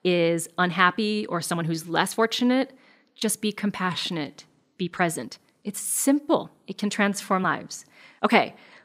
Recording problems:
uneven, jittery; strongly; from 0.5 to 8.5 s

